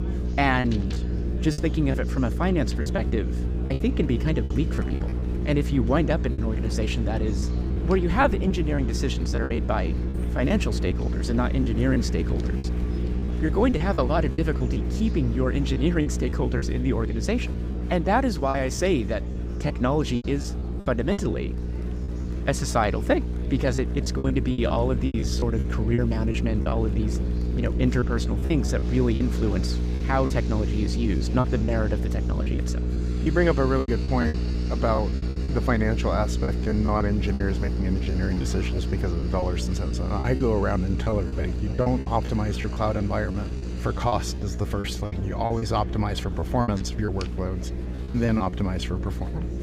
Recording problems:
electrical hum; noticeable; throughout; 60 Hz, 10 dB below the speech
murmuring crowd; noticeable; throughout; 20 dB below the speech
low rumble; noticeable; throughout; 20 dB below the speech
household noises; faint; throughout; 20 dB below the speech
choppy; very; 9% of the speech affected

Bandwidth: 15.5 kHz